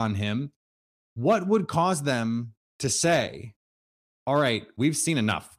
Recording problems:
abrupt cut into speech; at the start

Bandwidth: 15 kHz